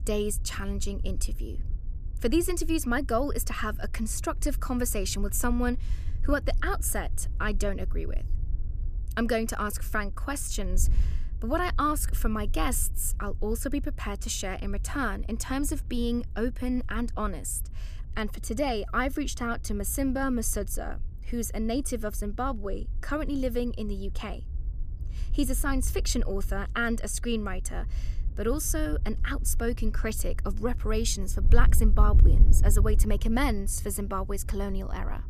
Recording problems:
wind noise on the microphone; occasional gusts; 20 dB below the speech

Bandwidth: 14.5 kHz